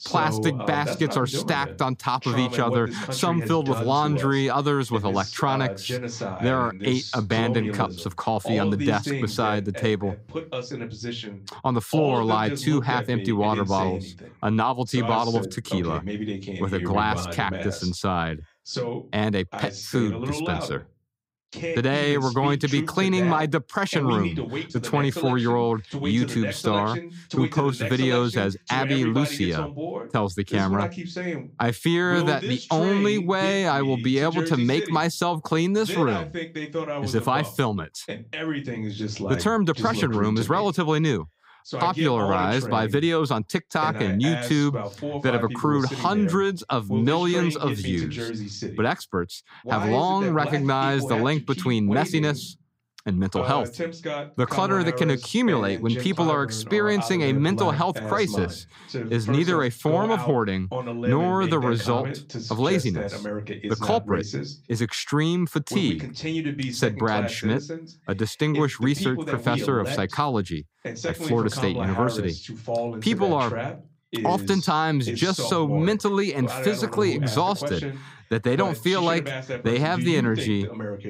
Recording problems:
voice in the background; loud; throughout; 7 dB below the speech

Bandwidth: 15.5 kHz